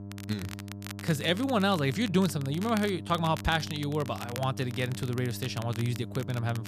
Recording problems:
electrical hum; noticeable; throughout; 50 Hz, 20 dB below the speech
crackle, like an old record; noticeable; 15 dB below the speech

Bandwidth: 14.5 kHz